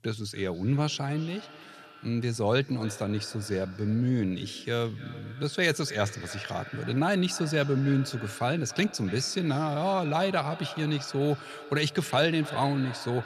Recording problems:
echo of what is said; noticeable; throughout; 290 ms later, 15 dB below the speech

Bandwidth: 14 kHz